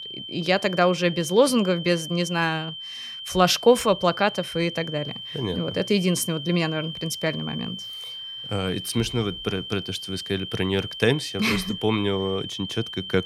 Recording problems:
high-pitched whine; loud; throughout; 3 kHz, 9 dB below the speech

